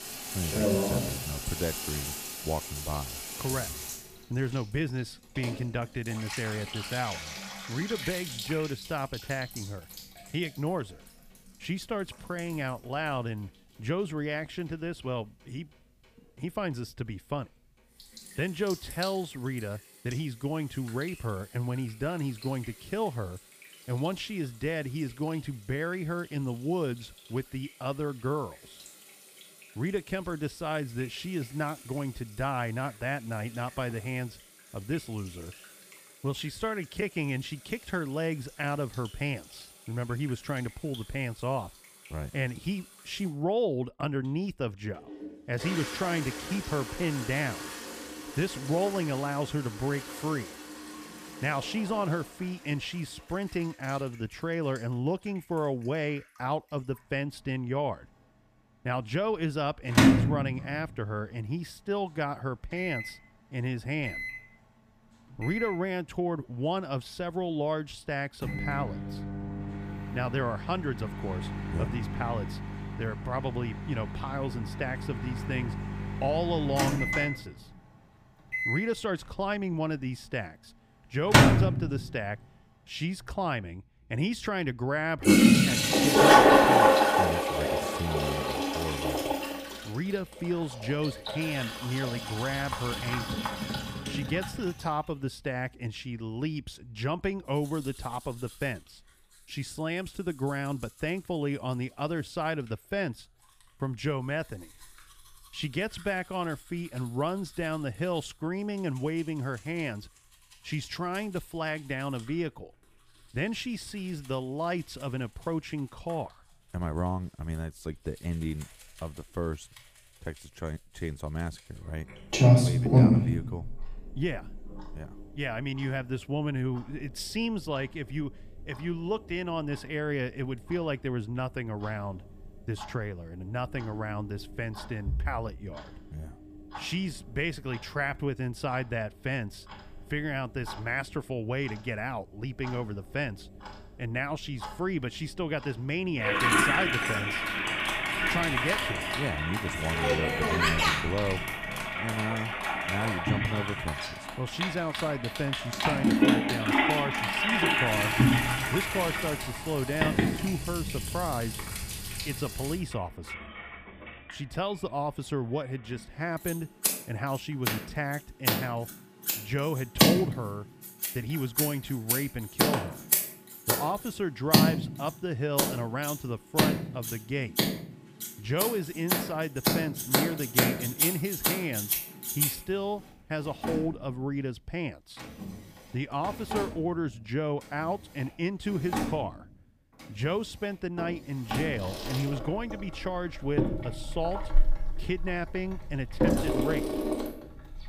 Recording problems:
household noises; very loud; throughout; 5 dB above the speech

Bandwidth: 15 kHz